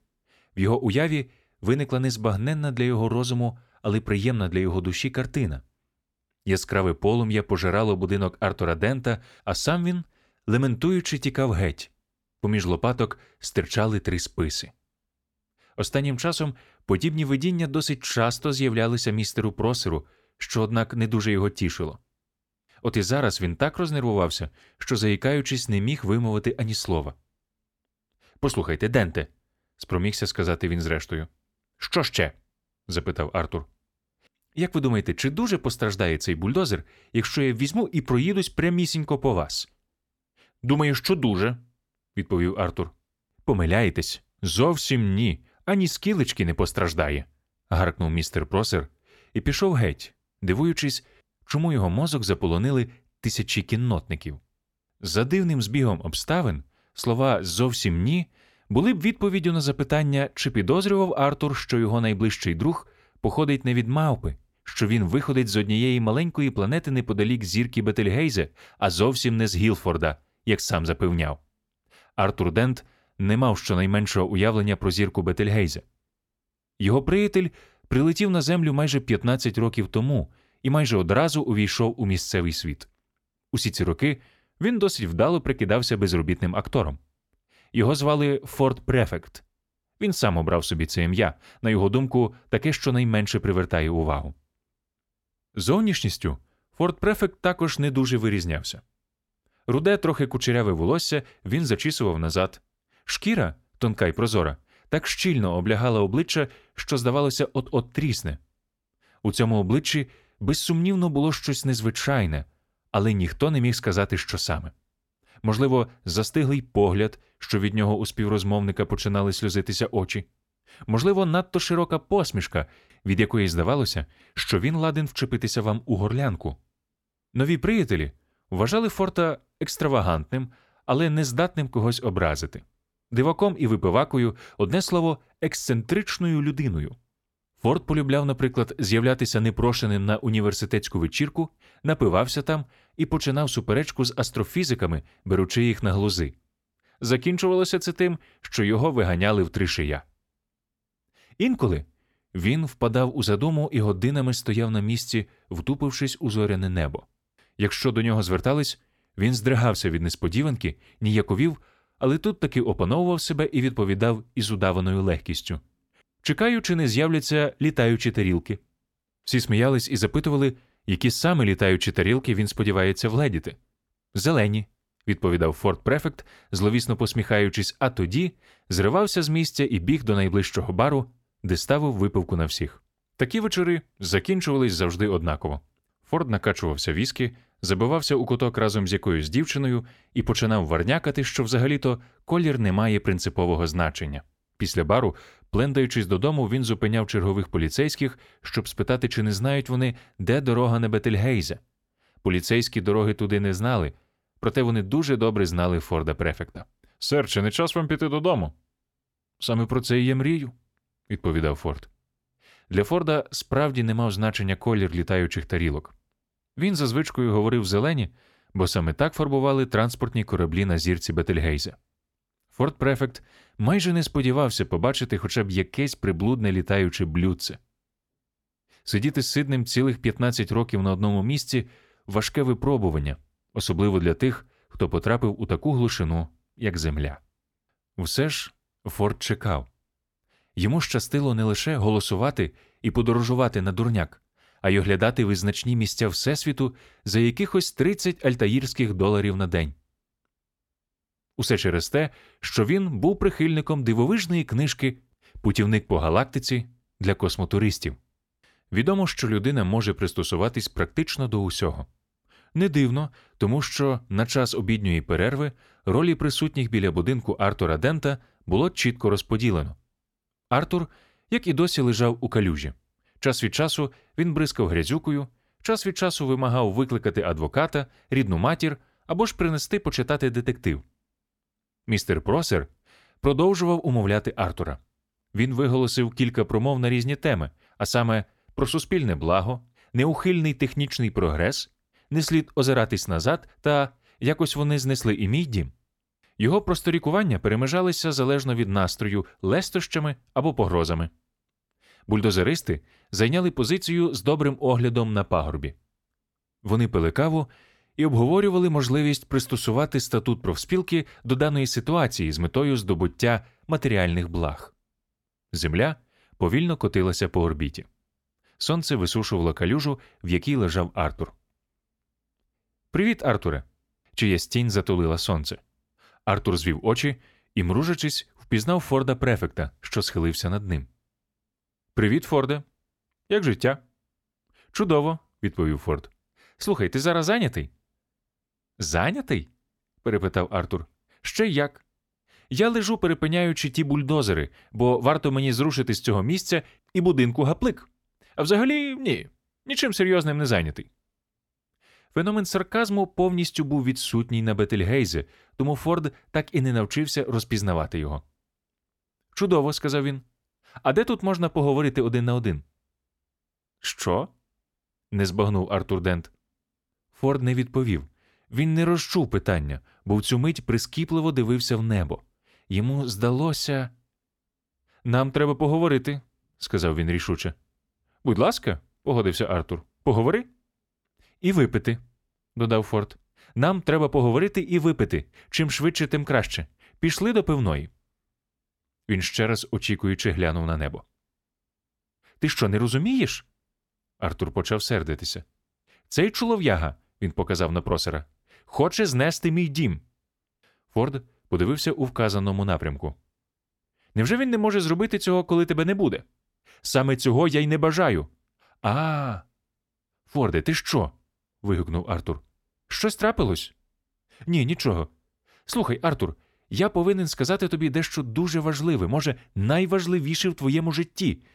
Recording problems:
none

